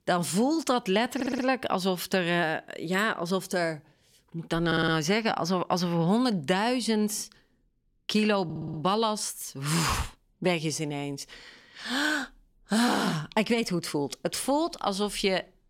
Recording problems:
audio stuttering; at 1 s, at 4.5 s and at 8.5 s

